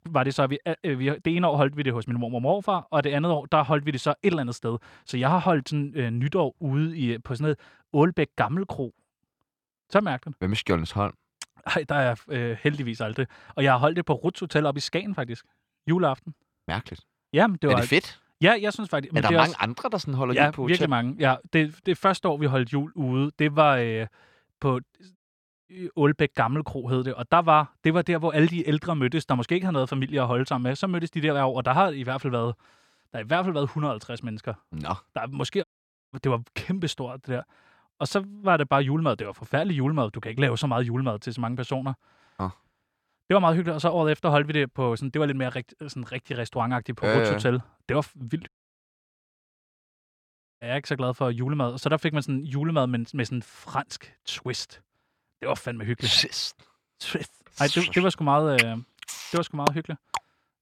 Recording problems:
audio cutting out; at 25 s for 0.5 s, at 36 s and at 48 s for 2 s

